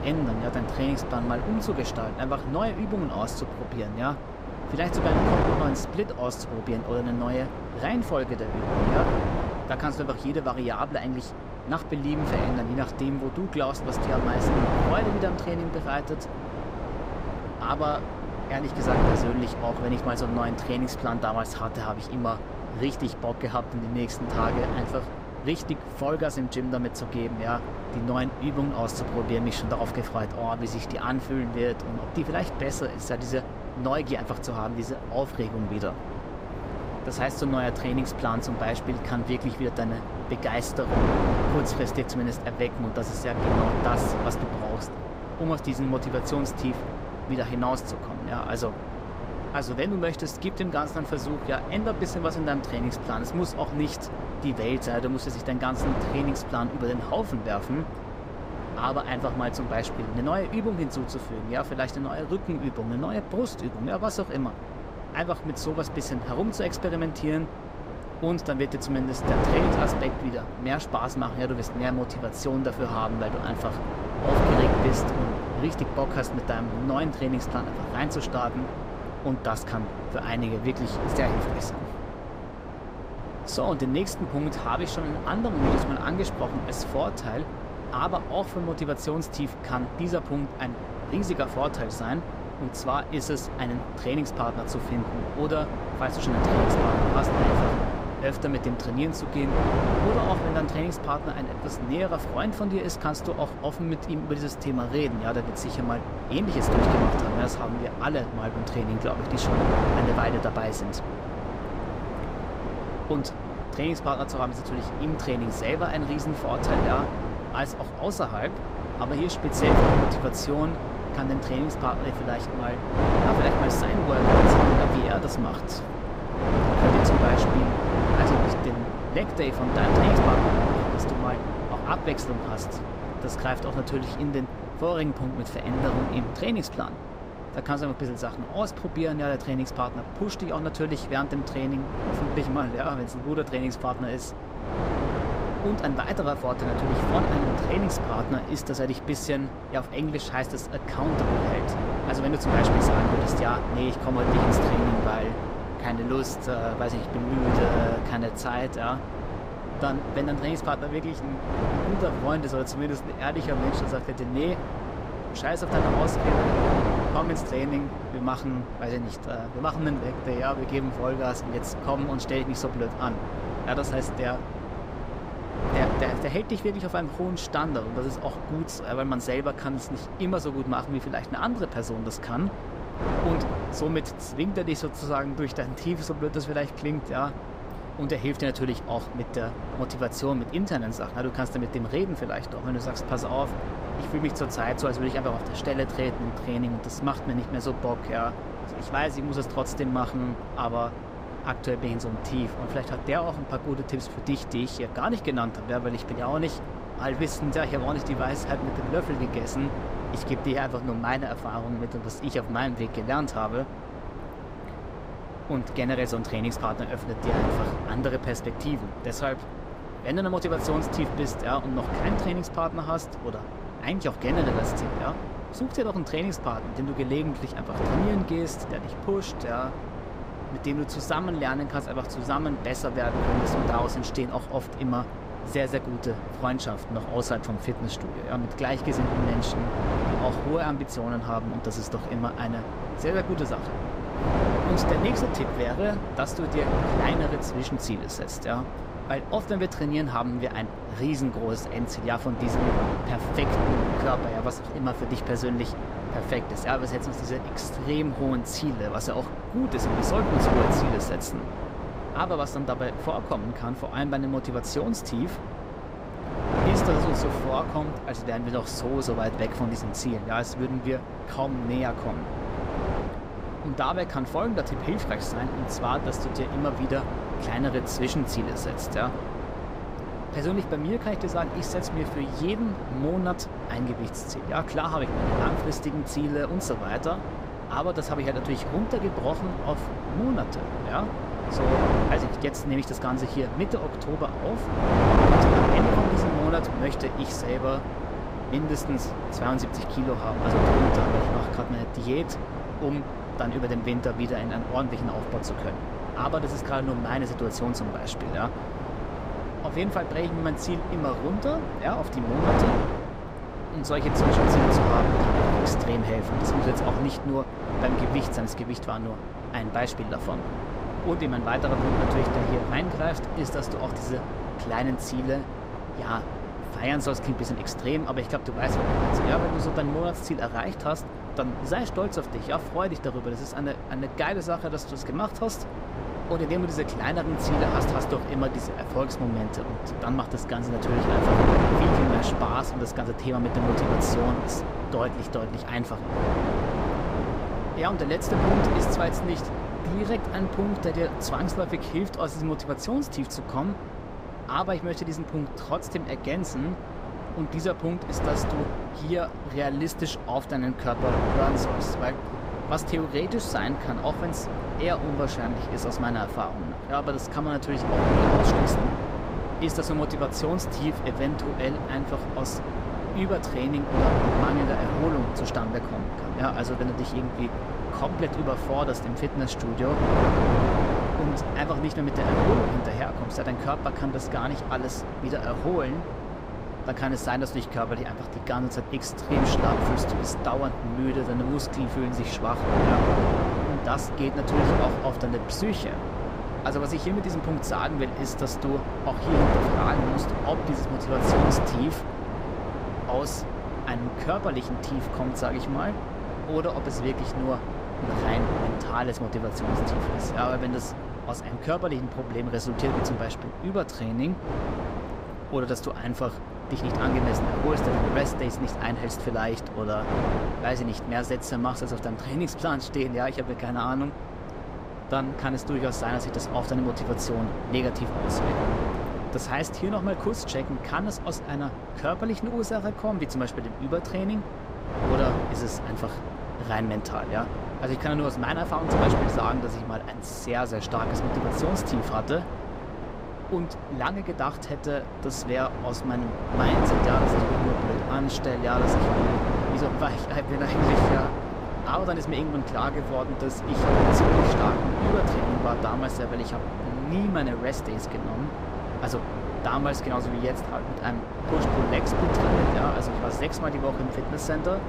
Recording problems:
wind noise on the microphone; heavy; as loud as the speech

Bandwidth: 15.5 kHz